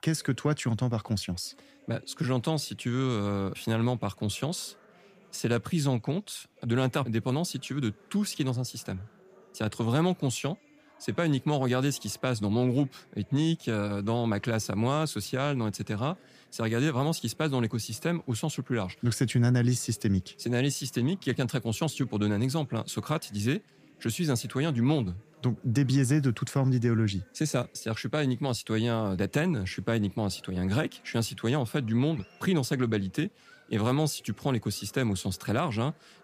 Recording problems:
murmuring crowd; faint; throughout; 30 dB below the speech

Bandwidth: 15 kHz